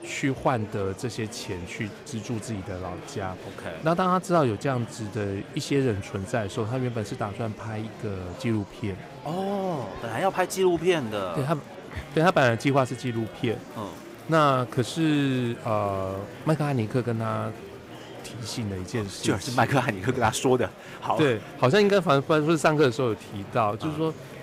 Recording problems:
murmuring crowd; noticeable; throughout; 15 dB below the speech

